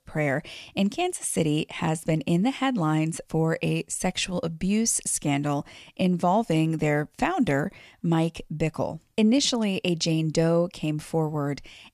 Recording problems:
none

